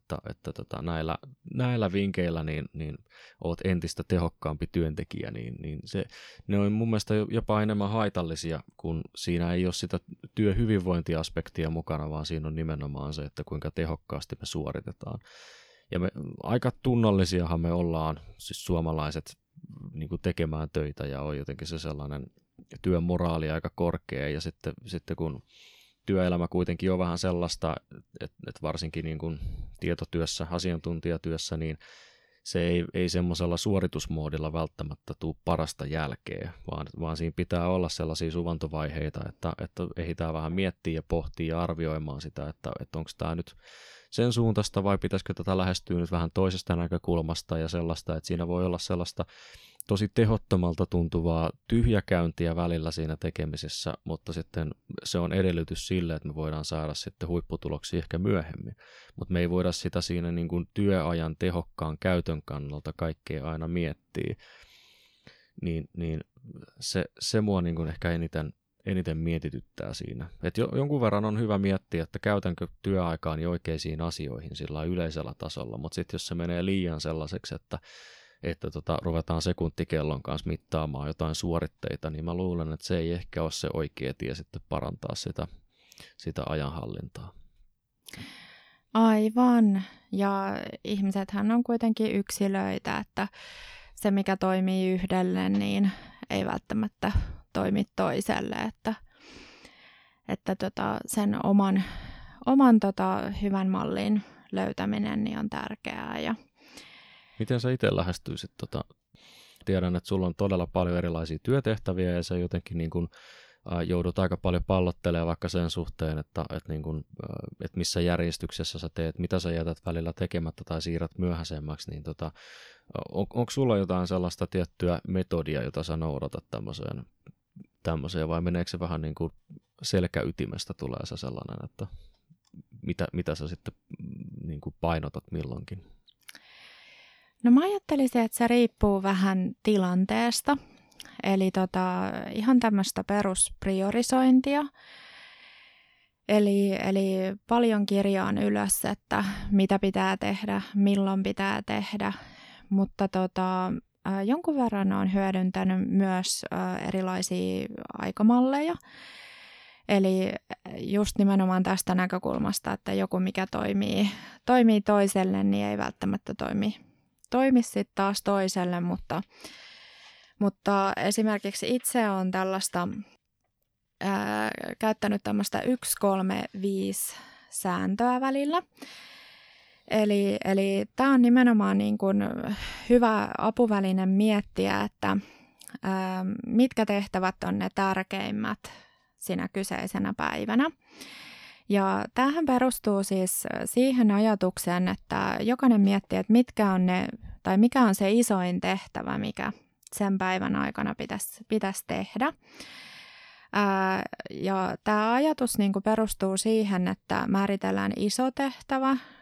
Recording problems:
none

